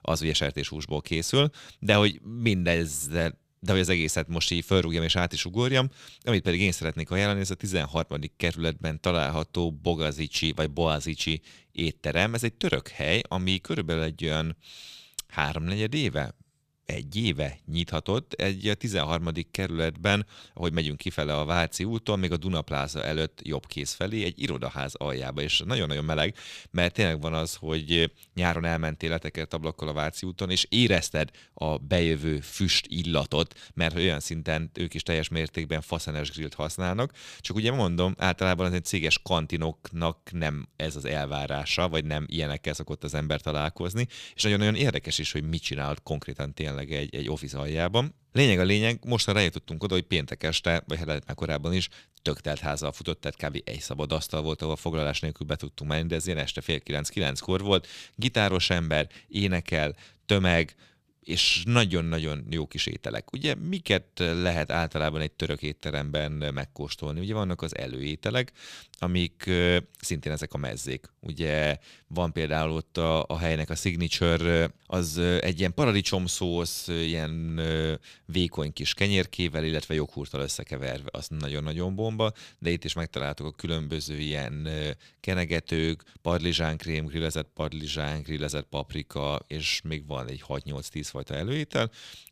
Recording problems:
none

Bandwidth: 14.5 kHz